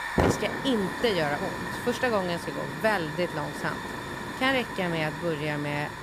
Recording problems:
hiss; loud; throughout; 4 dB below the speech

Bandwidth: 15 kHz